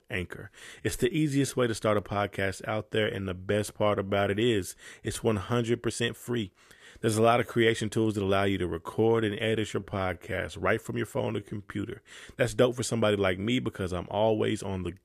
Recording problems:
uneven, jittery; strongly; from 1 to 13 s

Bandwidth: 14.5 kHz